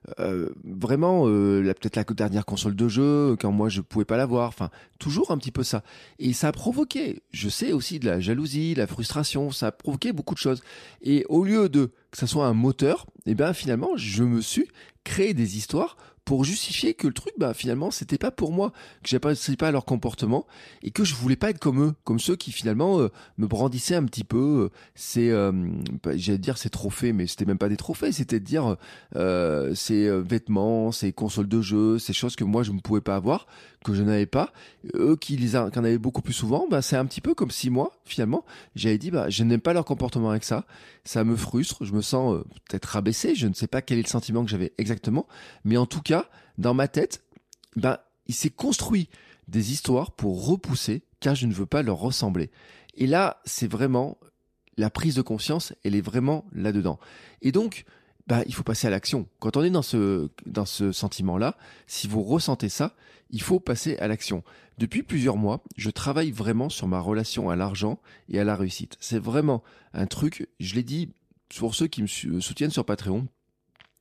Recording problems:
none

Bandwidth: 14.5 kHz